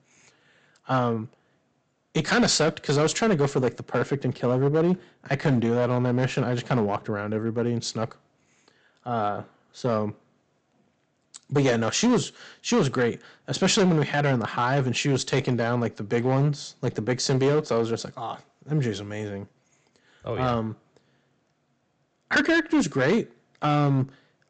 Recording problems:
high frequencies cut off; noticeable; nothing above 8 kHz
distortion; slight; 5% of the sound clipped

